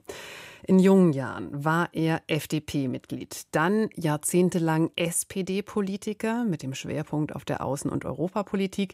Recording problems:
none

